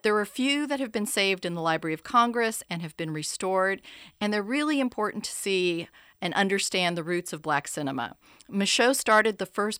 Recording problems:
none

